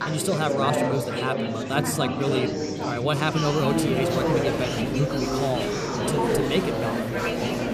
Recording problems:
chatter from many people; very loud; throughout; 1 dB above the speech

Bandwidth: 15 kHz